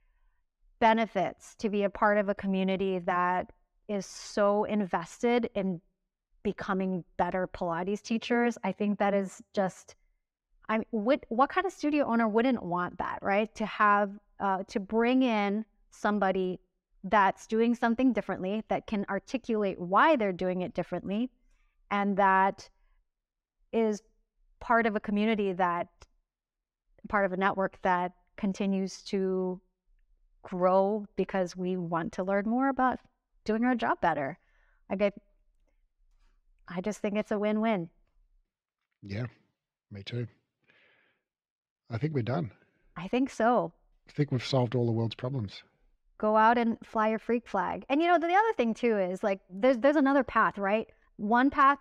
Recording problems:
muffled; slightly; fading above 2.5 kHz

